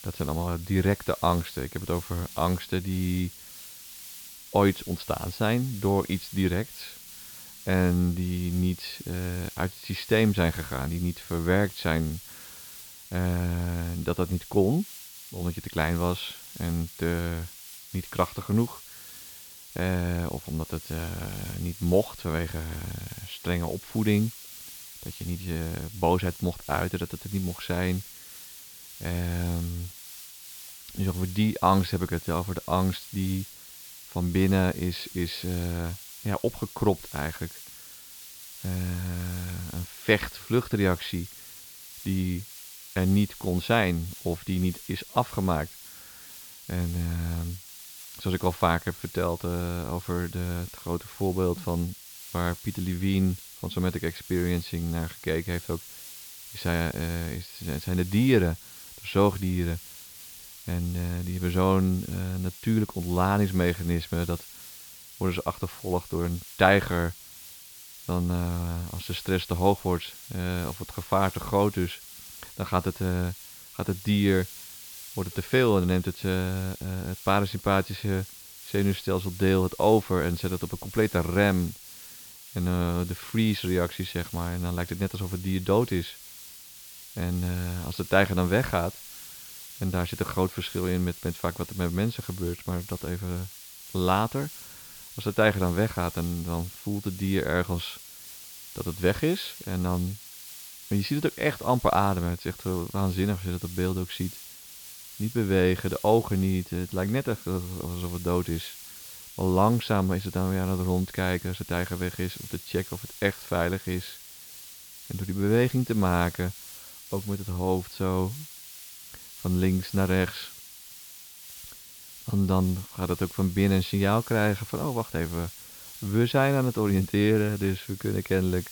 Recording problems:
high frequencies cut off; noticeable; nothing above 5.5 kHz
hiss; noticeable; throughout; 15 dB below the speech

